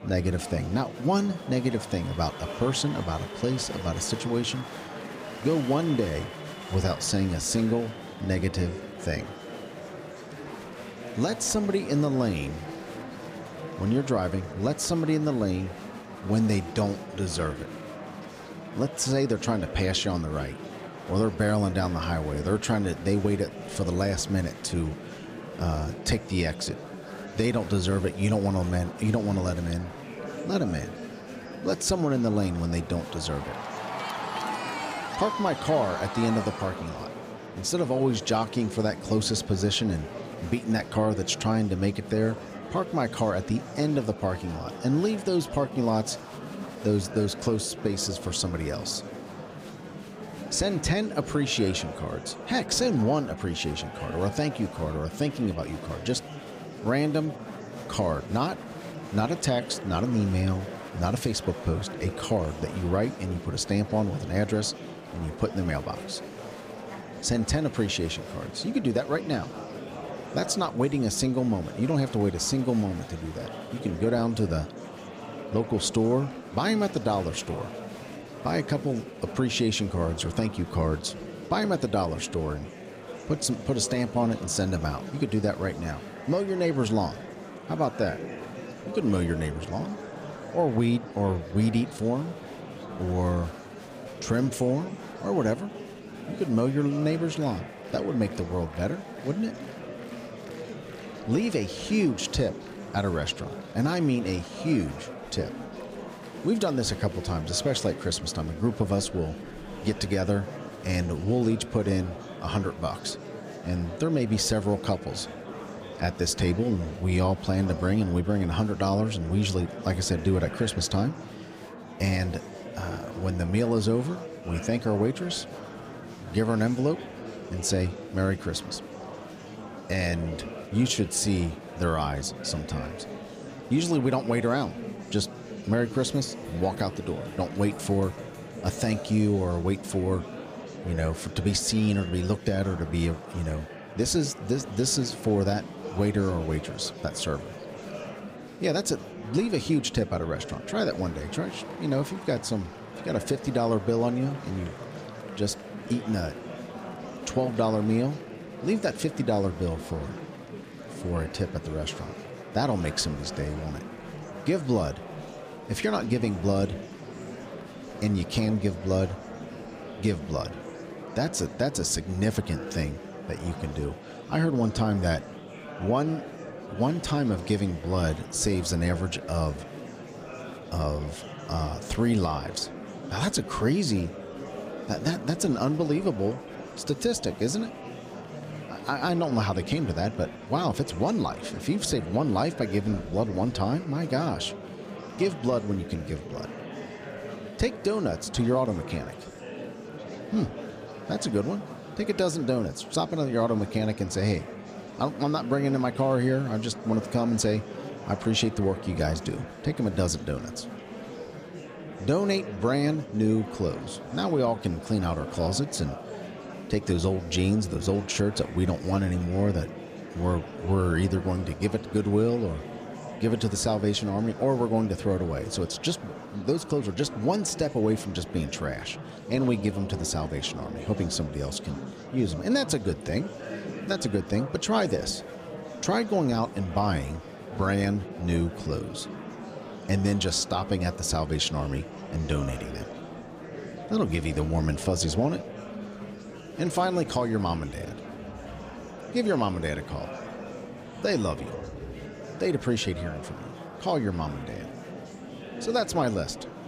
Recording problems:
murmuring crowd; noticeable; throughout; 10 dB below the speech

